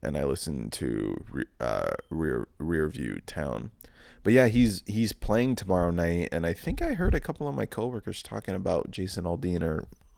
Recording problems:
garbled, watery; slightly; nothing above 18.5 kHz

